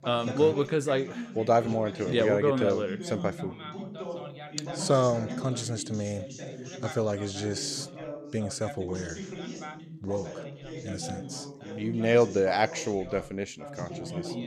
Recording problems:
background chatter; noticeable; throughout; 2 voices, 10 dB below the speech

